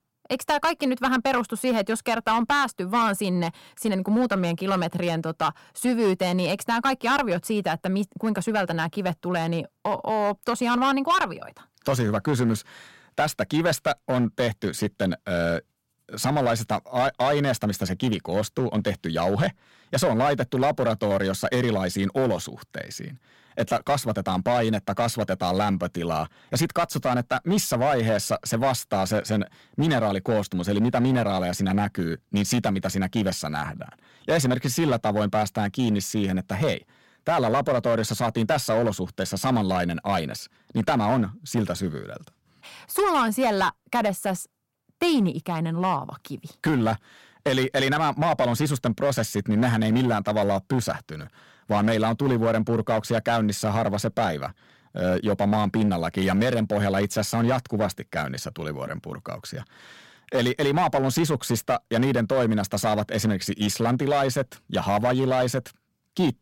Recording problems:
distortion; slight; 6% of the sound clipped

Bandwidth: 16.5 kHz